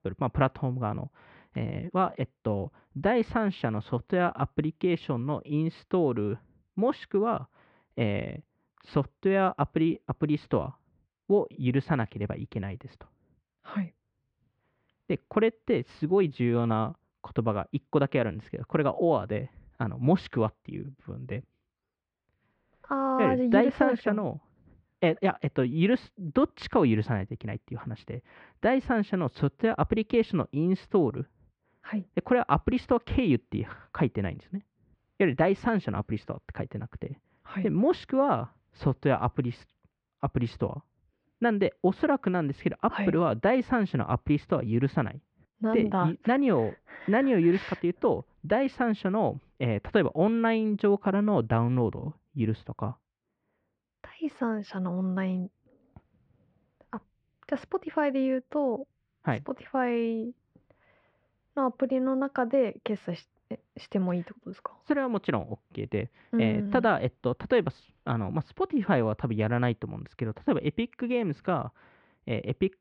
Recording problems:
muffled; very; fading above 2.5 kHz

